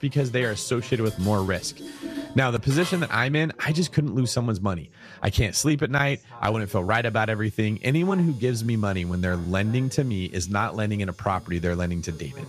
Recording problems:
household noises; noticeable; throughout; 20 dB below the speech
background chatter; faint; throughout; 2 voices, 25 dB below the speech

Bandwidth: 14.5 kHz